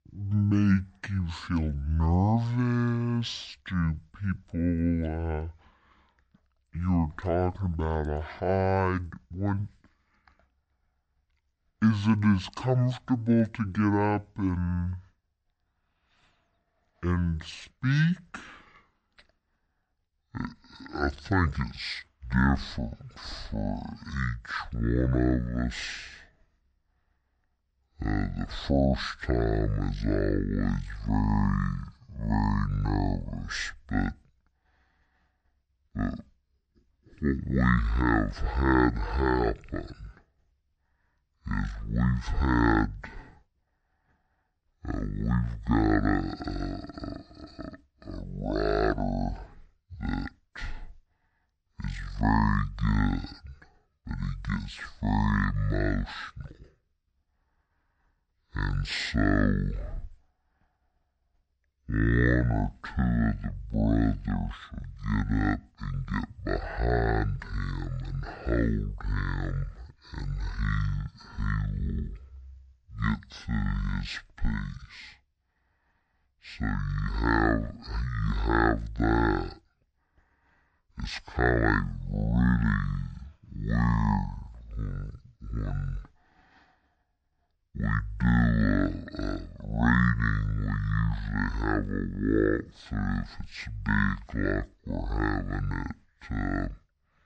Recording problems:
wrong speed and pitch; too slow and too low; 0.5 times normal speed

